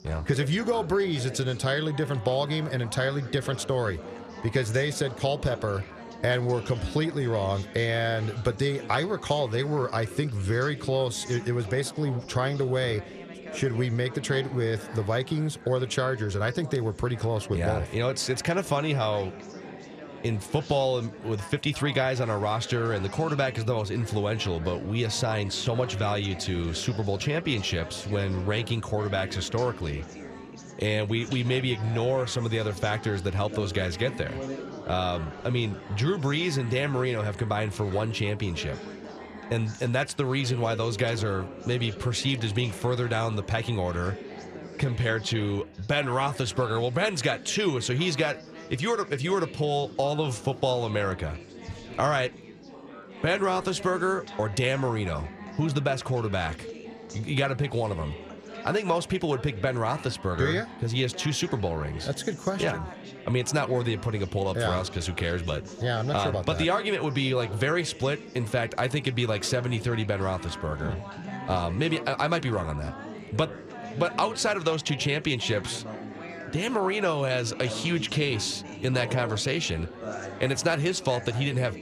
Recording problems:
chatter from many people; noticeable; throughout; 15 dB below the speech

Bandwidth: 14 kHz